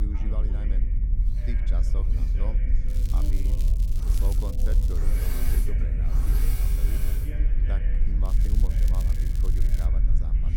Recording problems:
machinery noise; very loud; throughout; 2 dB above the speech
voice in the background; loud; throughout; 5 dB below the speech
low rumble; loud; throughout; 1 dB below the speech
crackling; loud; from 3 to 5 s and from 8.5 to 10 s; 5 dB below the speech
abrupt cut into speech; at the start

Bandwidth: 17 kHz